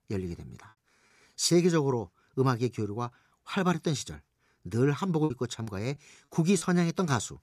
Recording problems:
choppy; occasionally; from 5 to 6.5 s; 5% of the speech affected

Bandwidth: 14.5 kHz